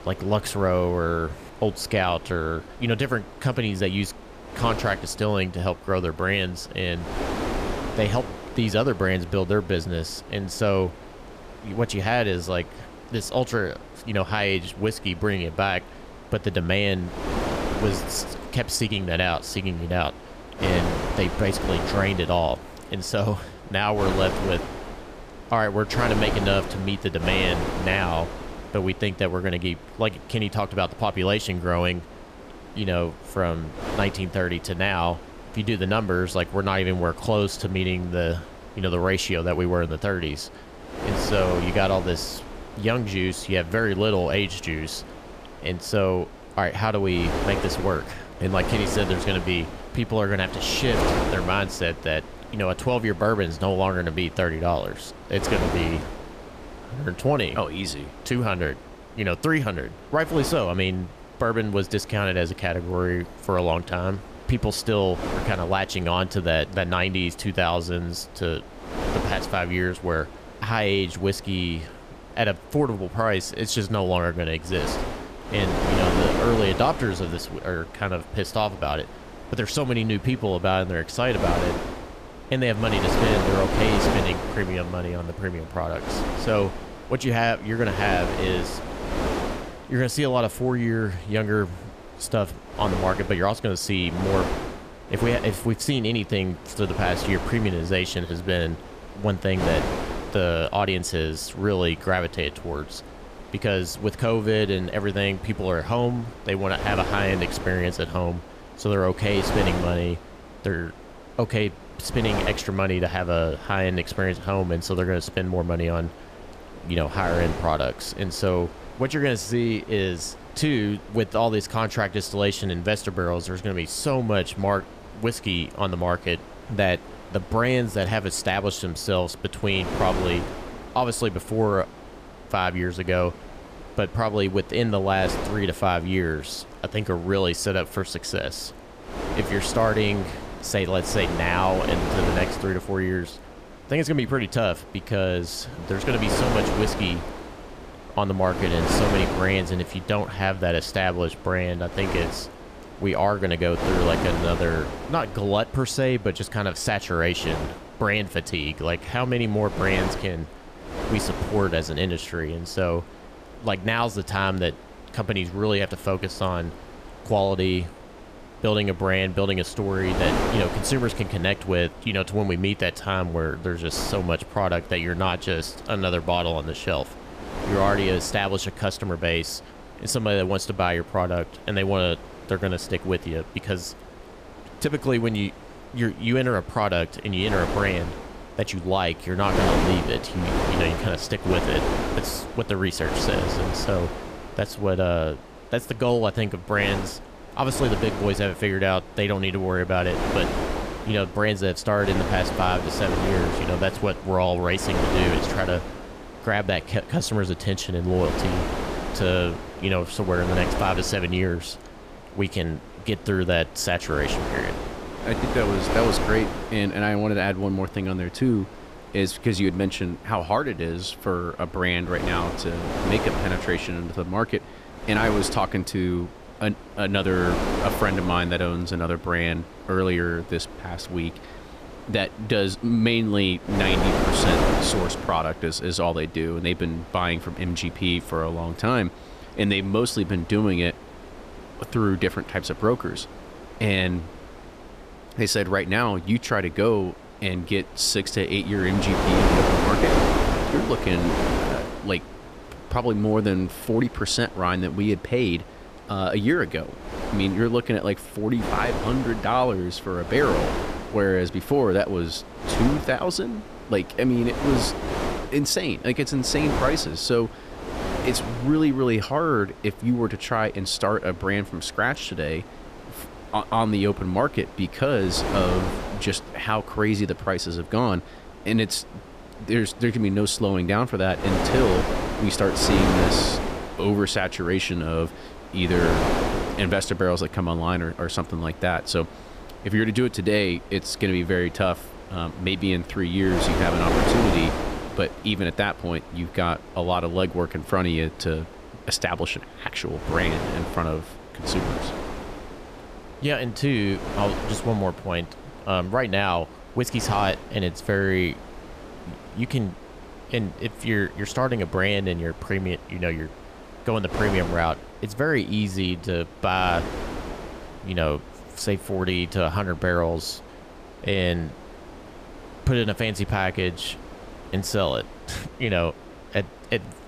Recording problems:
wind noise on the microphone; heavy; 6 dB below the speech

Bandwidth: 14.5 kHz